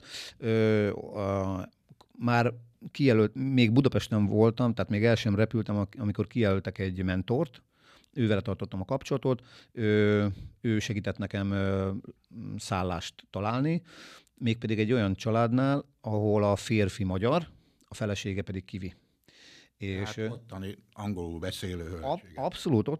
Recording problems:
none

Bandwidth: 14.5 kHz